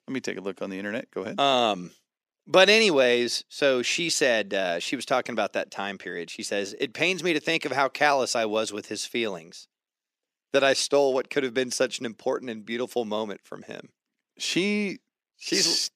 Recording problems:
thin; somewhat; fading below 250 Hz

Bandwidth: 14.5 kHz